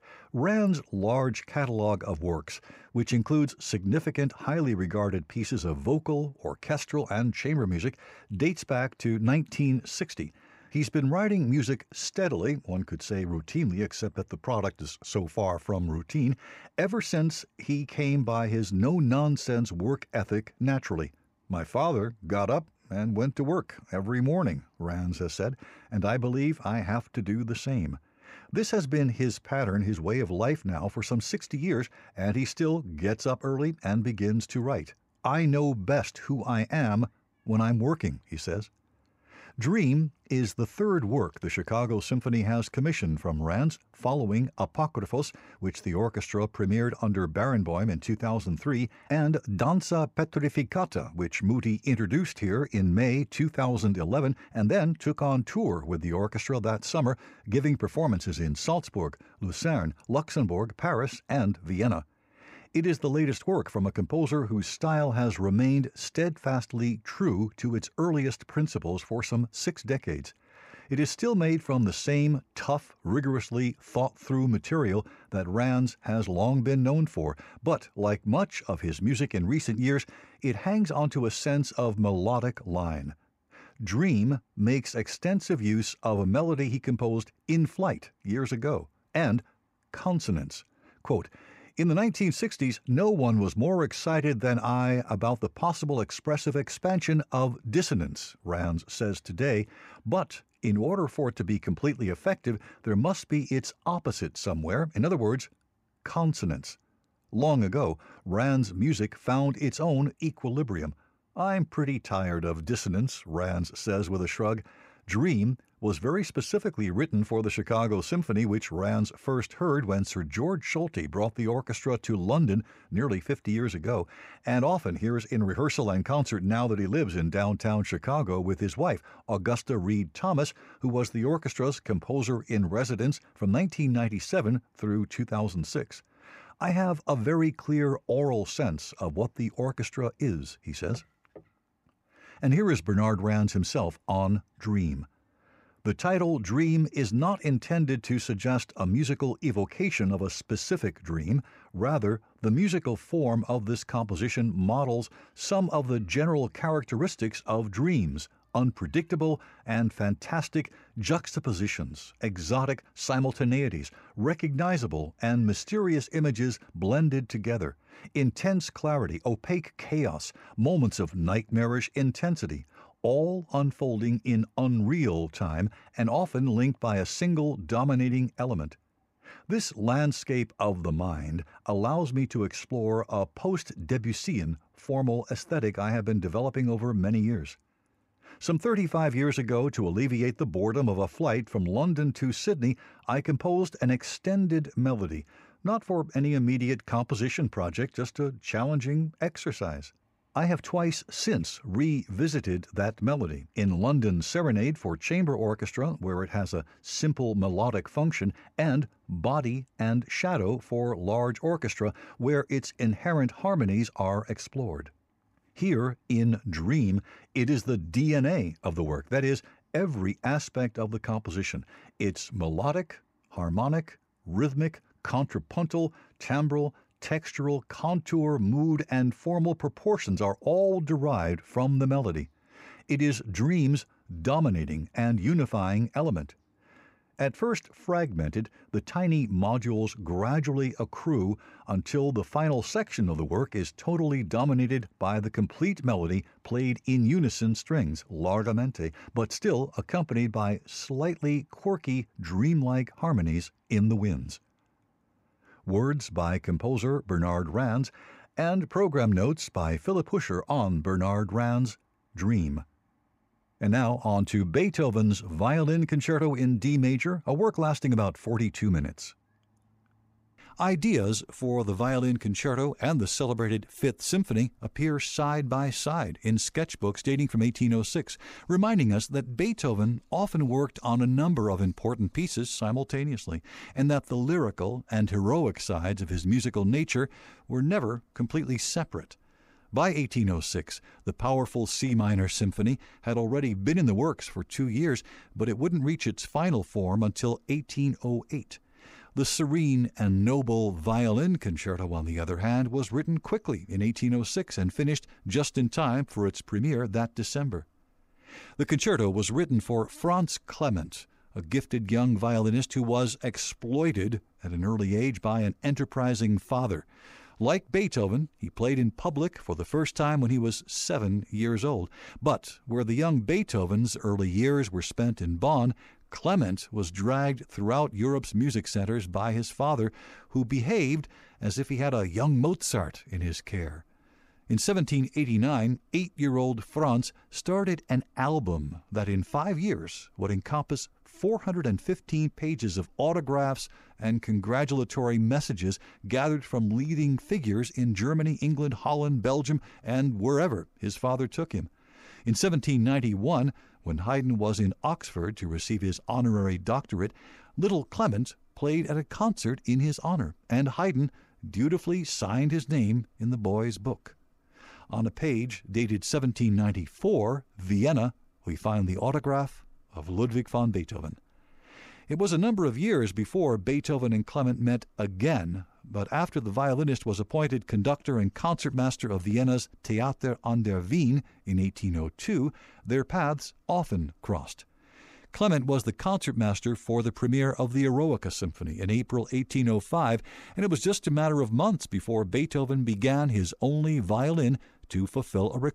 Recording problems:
none

